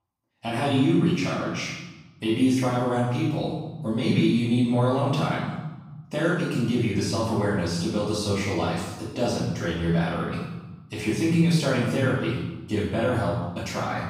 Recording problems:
room echo; strong; dies away in 1 s
off-mic speech; far

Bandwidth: 15.5 kHz